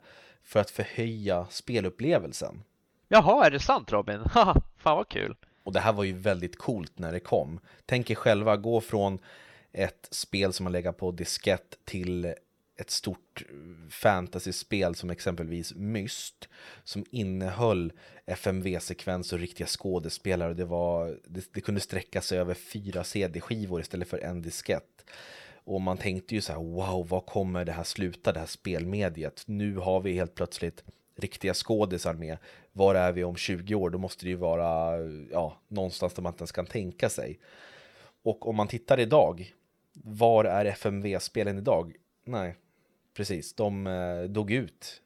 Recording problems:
none

